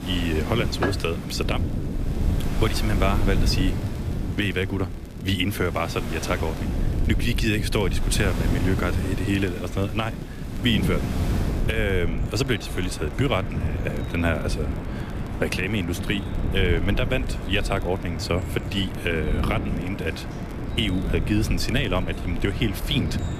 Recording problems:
rain or running water; noticeable; throughout; 10 dB below the speech
wind noise on the microphone; occasional gusts; 10 dB below the speech
crackle, like an old record; faint; 30 dB below the speech

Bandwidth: 14.5 kHz